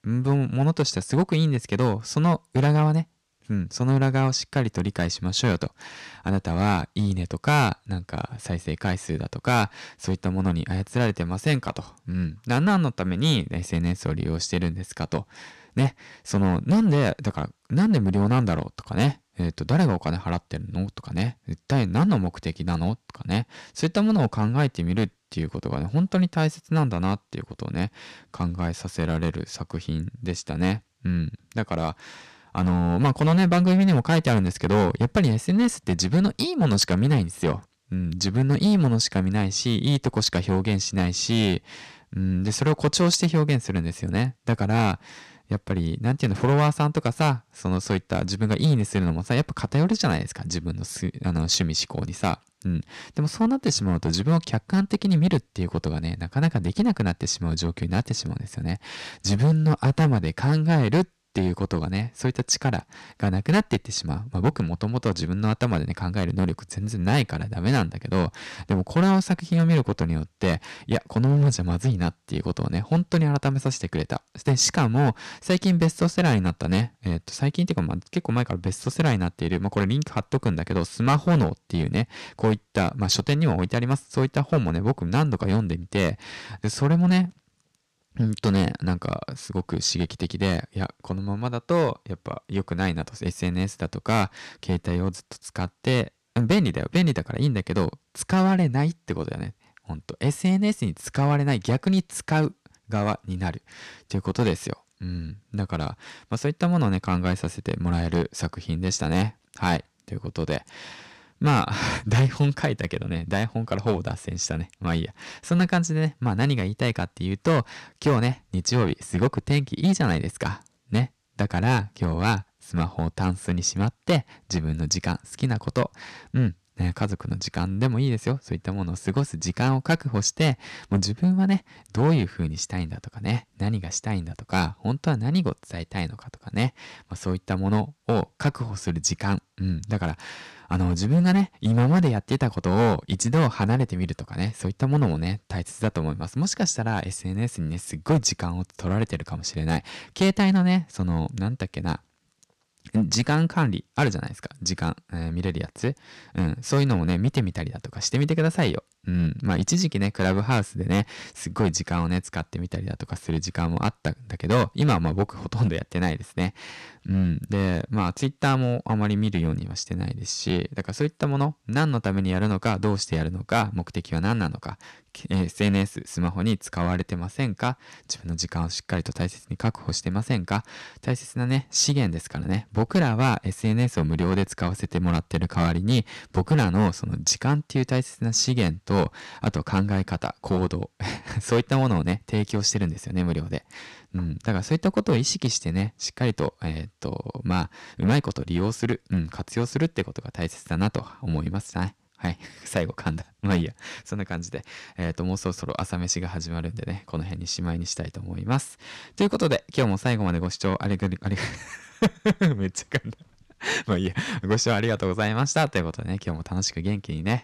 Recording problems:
distortion; slight; 4% of the sound clipped

